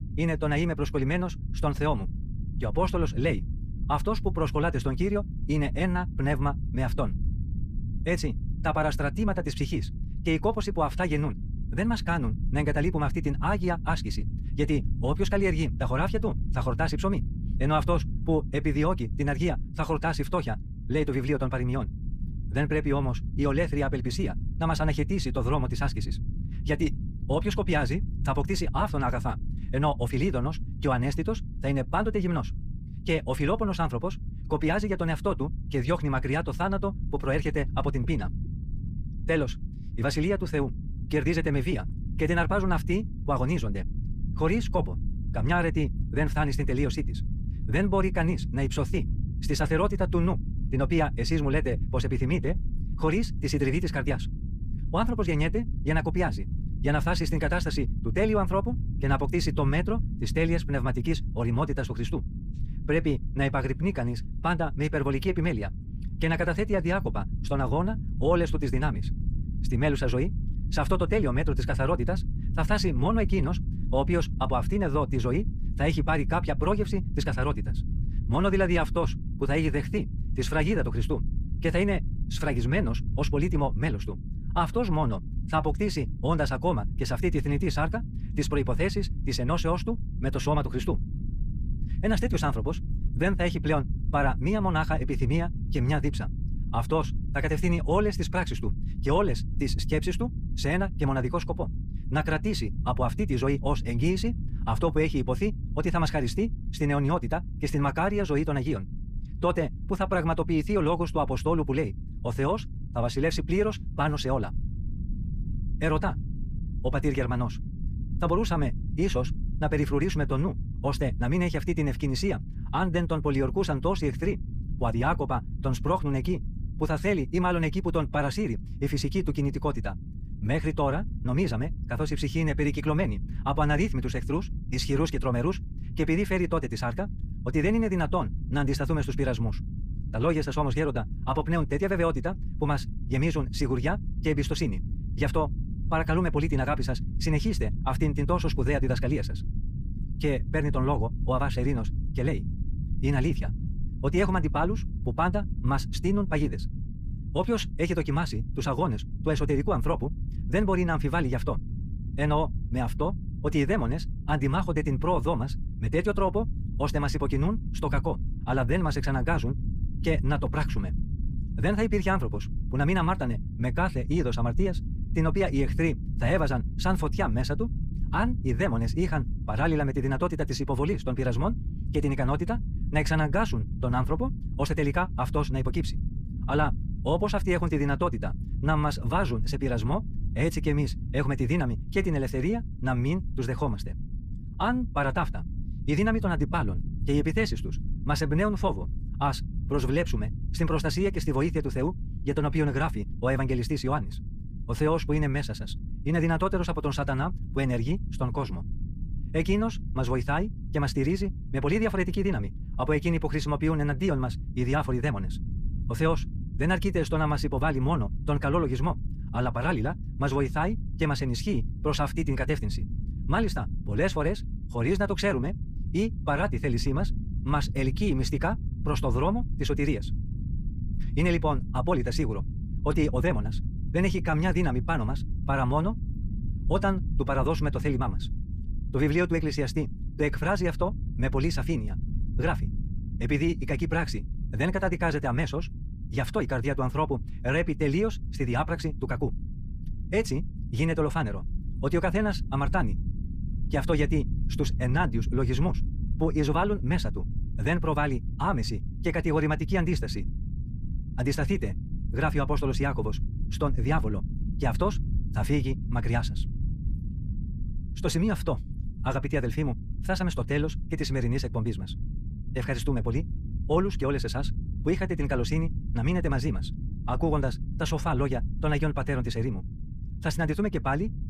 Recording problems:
wrong speed, natural pitch; too fast; 1.8 times normal speed
low rumble; noticeable; throughout; 15 dB below the speech

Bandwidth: 15 kHz